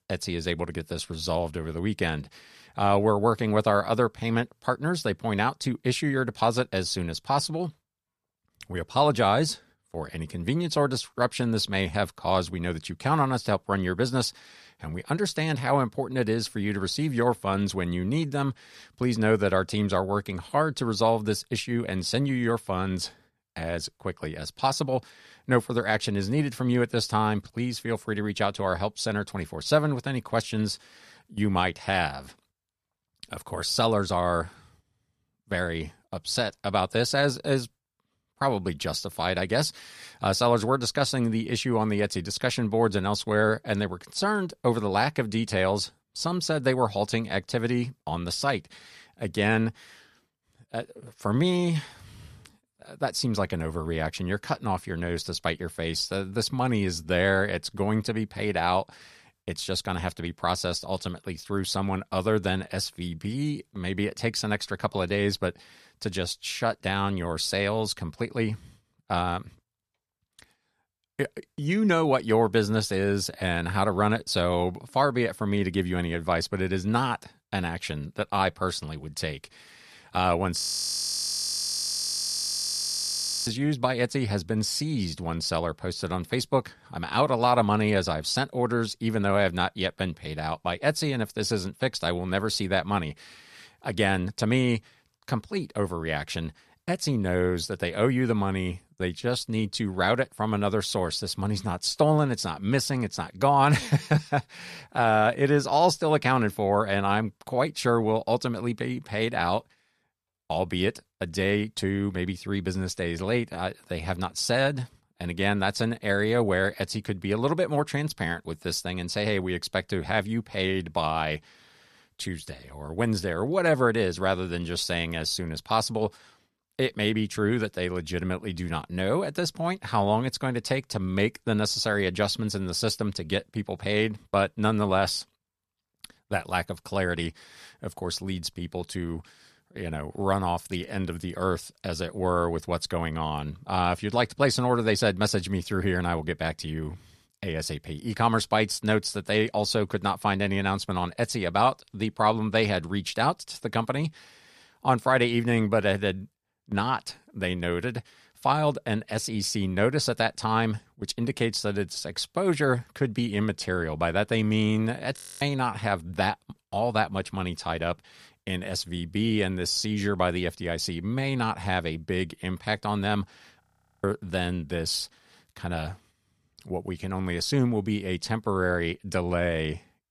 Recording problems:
audio freezing; at 1:21 for 3 s, at 2:45 and at 2:54

